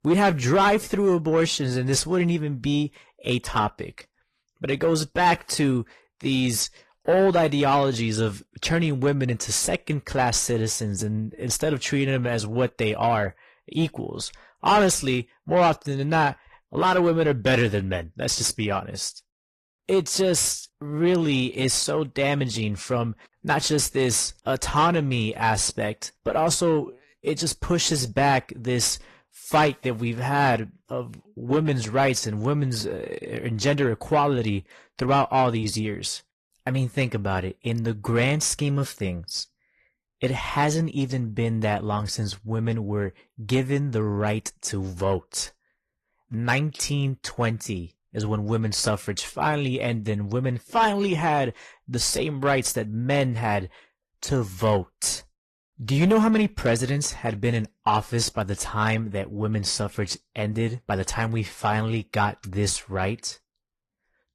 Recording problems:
distortion; slight; 10 dB below the speech
garbled, watery; slightly

